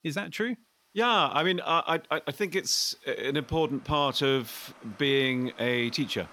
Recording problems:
rain or running water; faint; throughout; 25 dB below the speech

